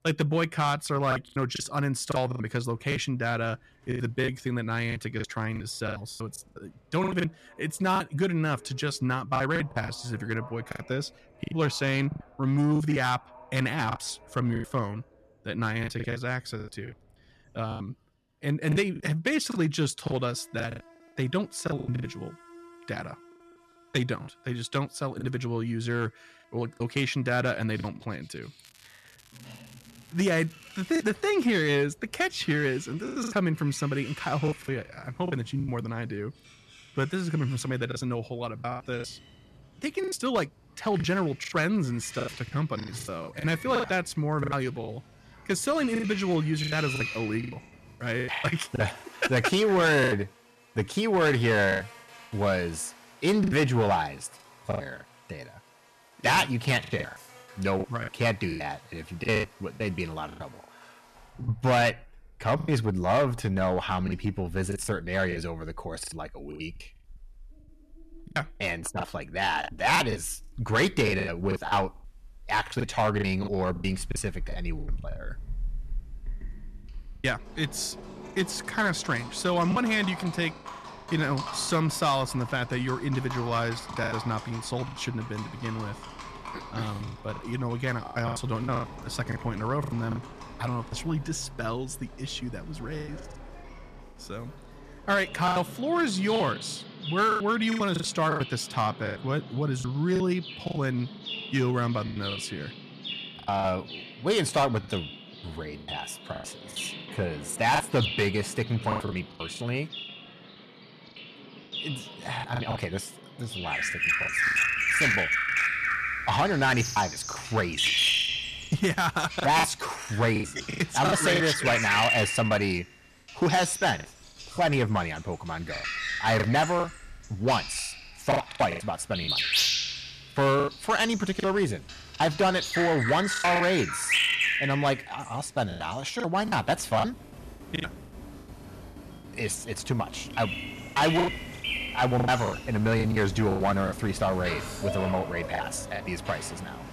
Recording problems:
distortion; slight; 3% of the sound clipped
animal sounds; loud; throughout; 4 dB below the speech
crackling; faint; from 29 to 31 s; 25 dB below the speech
choppy; very; 11% of the speech affected

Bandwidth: 13.5 kHz